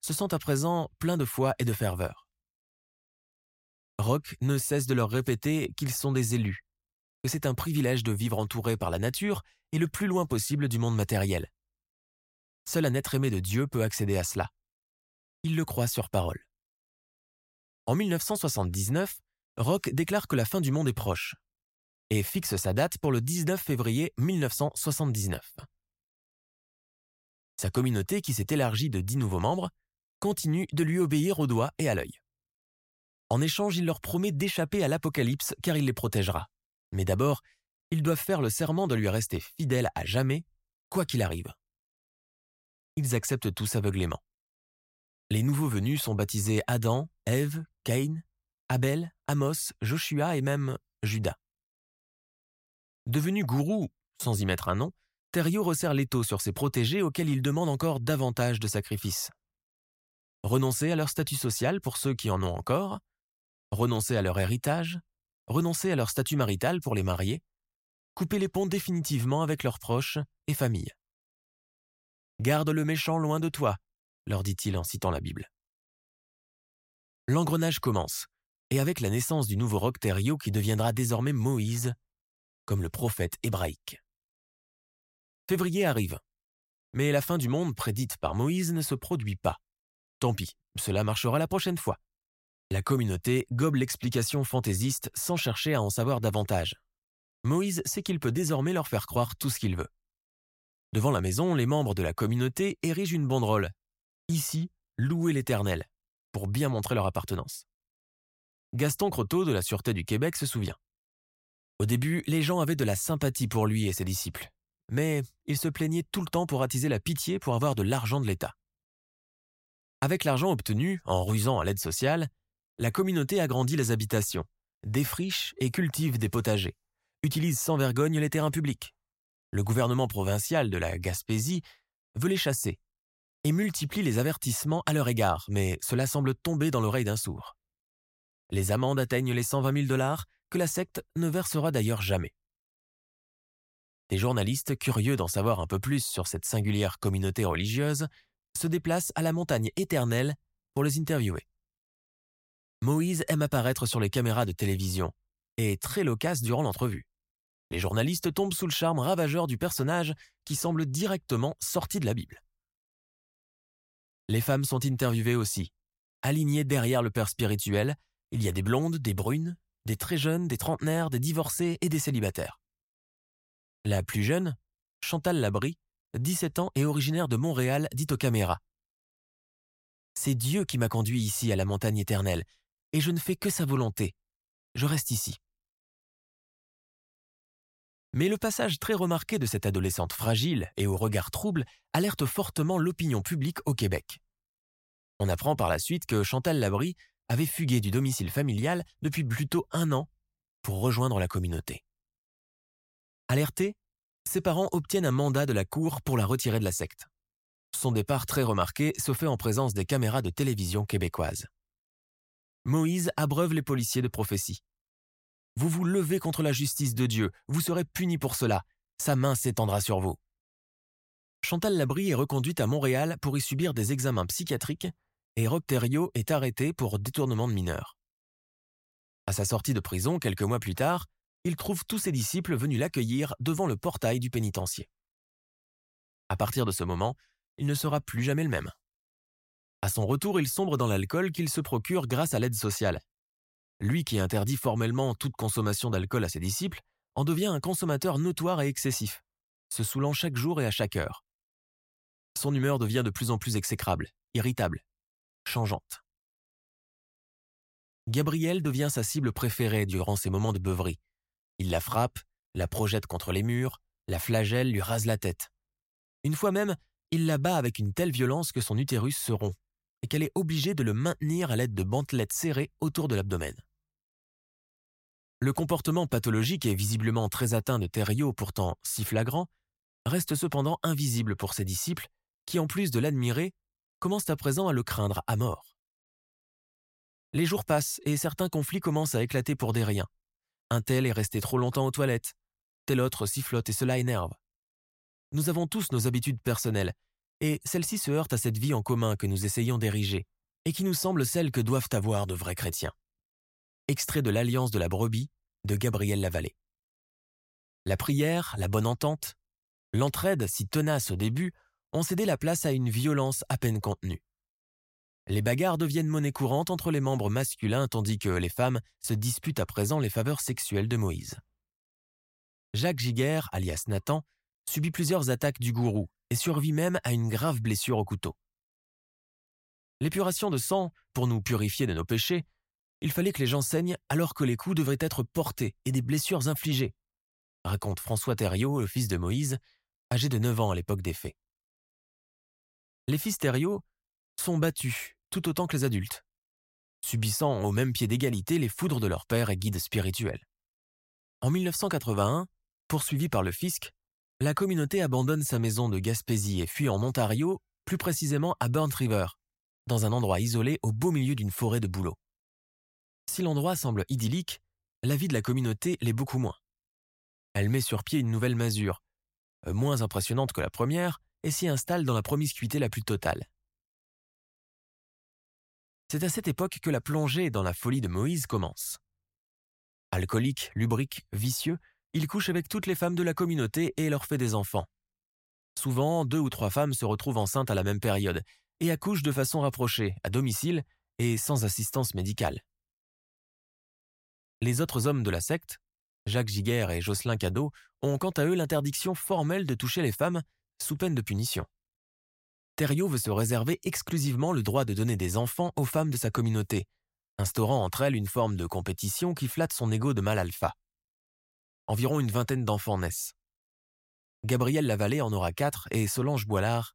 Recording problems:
none

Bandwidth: 16 kHz